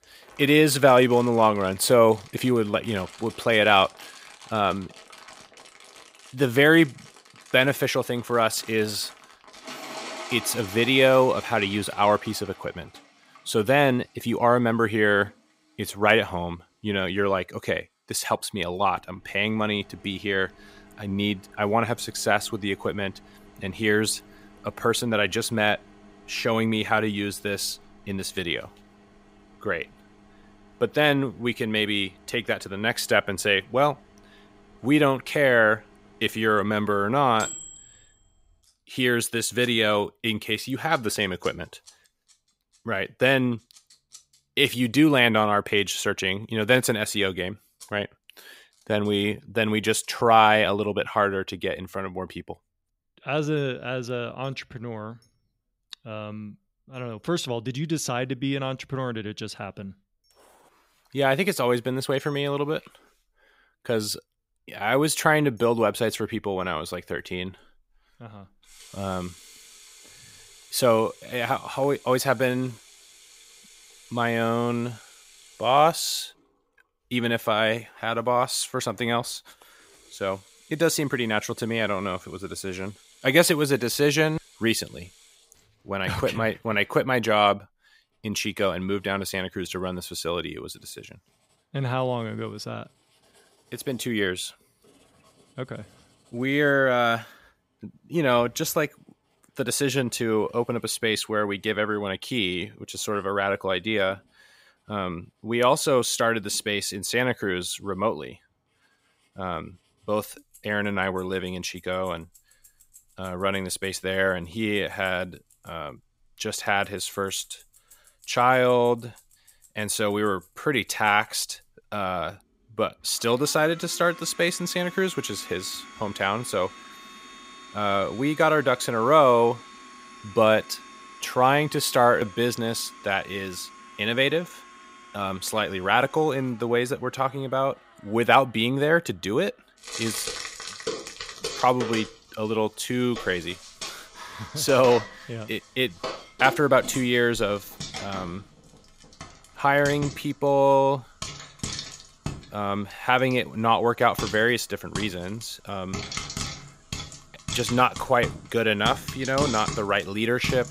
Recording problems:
household noises; noticeable; throughout; 15 dB below the speech

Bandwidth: 15.5 kHz